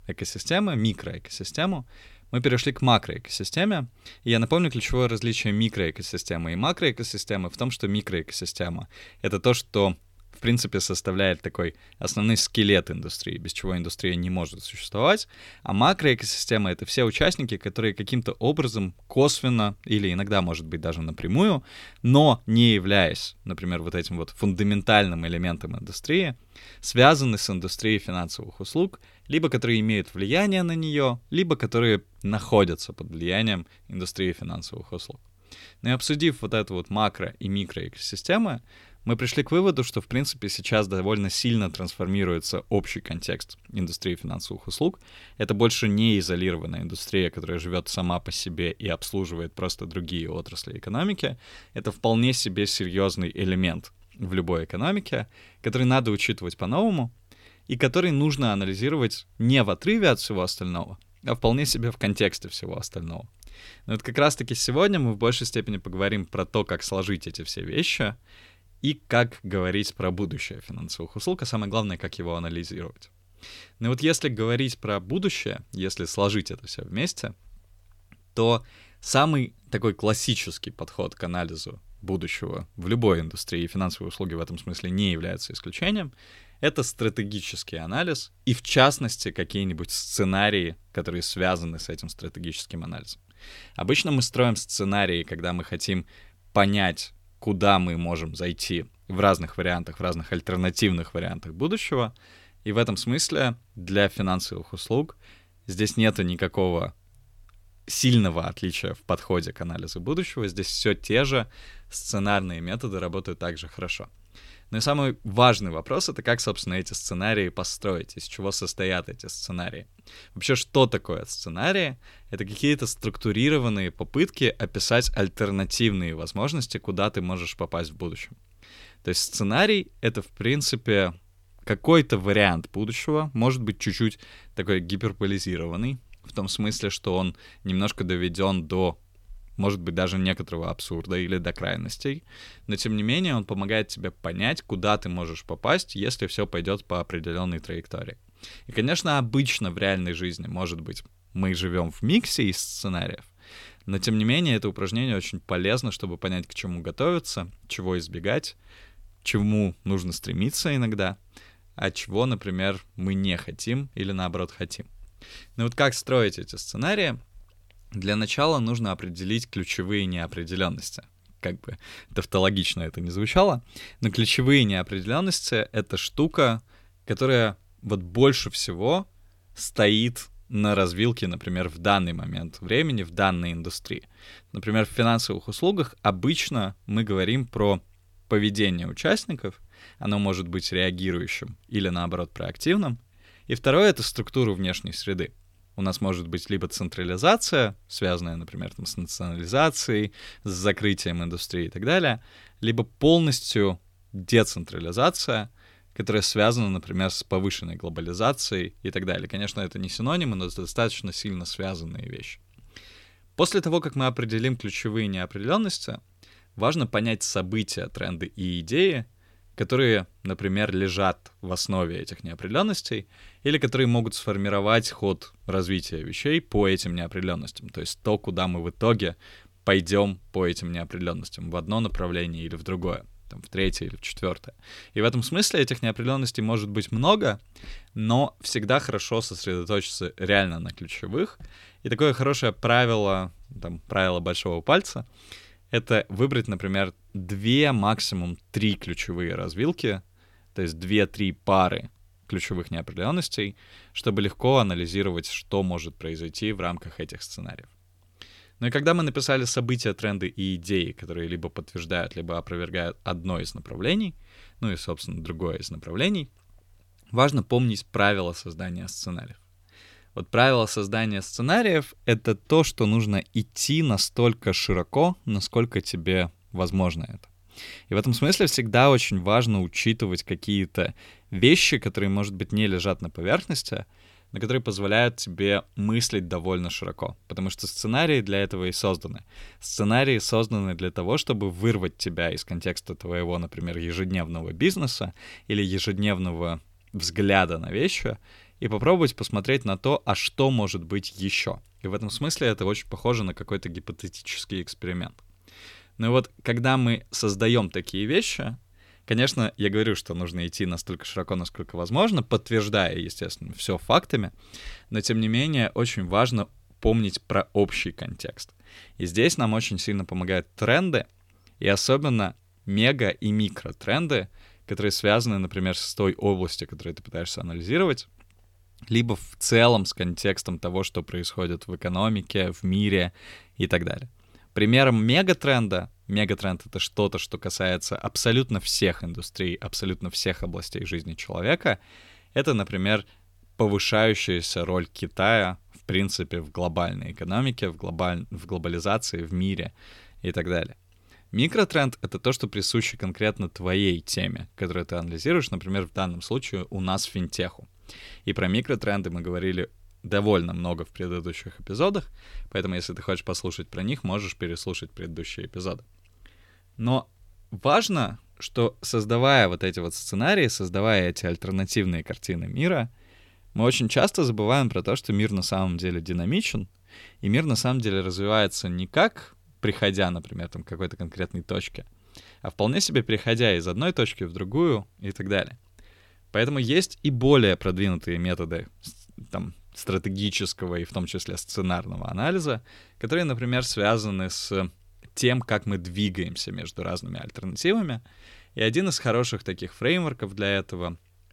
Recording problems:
none

